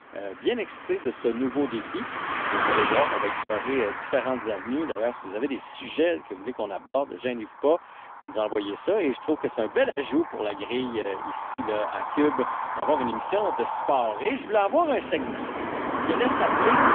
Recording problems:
phone-call audio; poor line; nothing above 3.5 kHz
traffic noise; loud; throughout; 2 dB below the speech
choppy; occasionally; 3% of the speech affected

